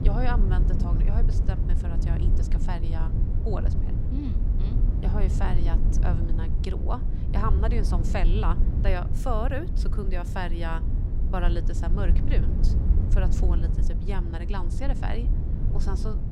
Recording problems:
low rumble; loud; throughout; 6 dB below the speech

